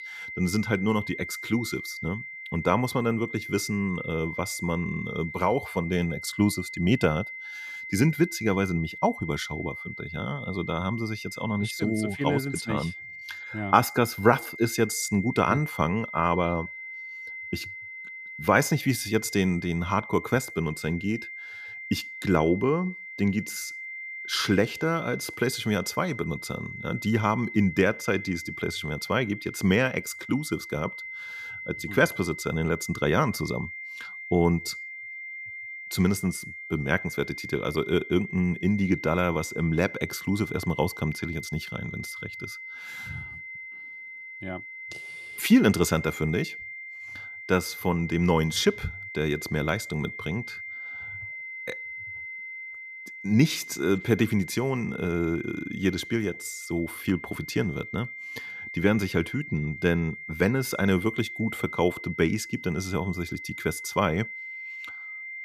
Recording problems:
high-pitched whine; loud; throughout; 2 kHz, 10 dB below the speech

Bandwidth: 14.5 kHz